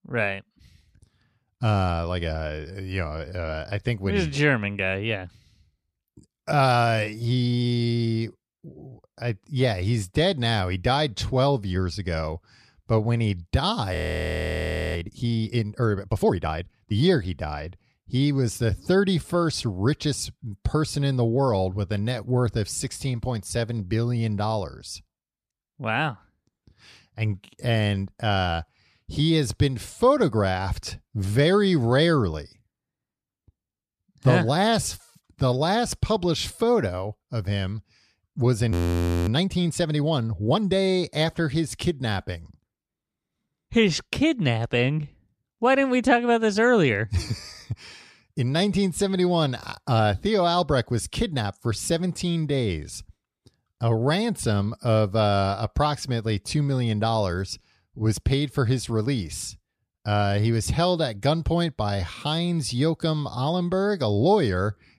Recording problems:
audio freezing; at 14 s for 1 s and at 39 s for 0.5 s

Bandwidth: 14 kHz